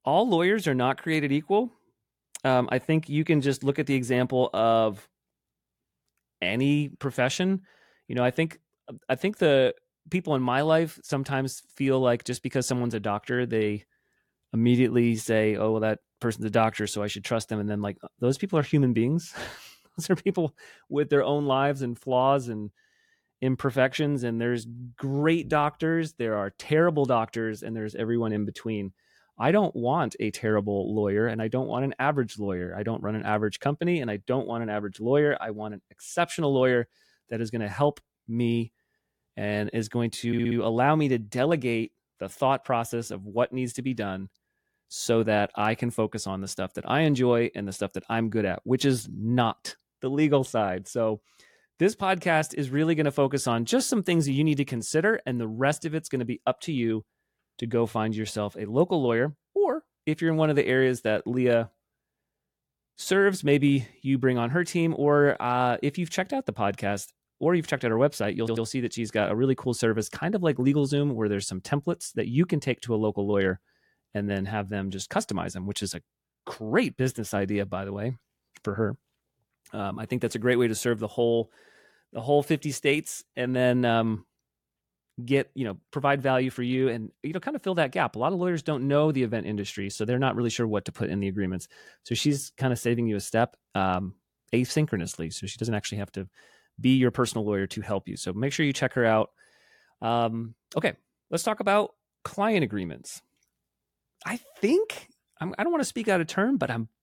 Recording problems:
audio stuttering; at 40 s and at 1:08

